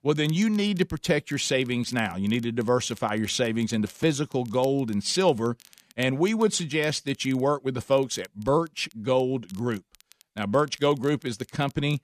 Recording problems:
crackle, like an old record; faint; 25 dB below the speech

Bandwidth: 14.5 kHz